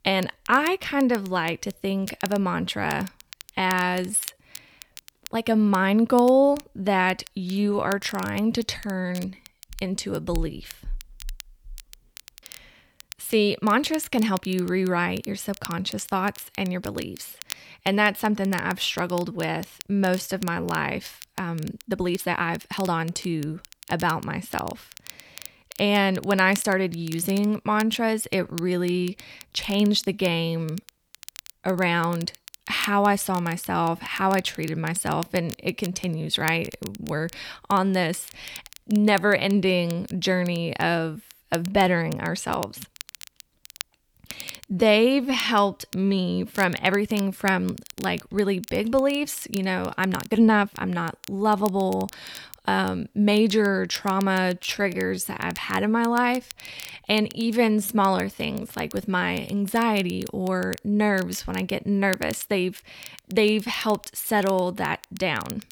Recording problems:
crackle, like an old record; noticeable; 20 dB below the speech
uneven, jittery; strongly; from 3.5 s to 1:02

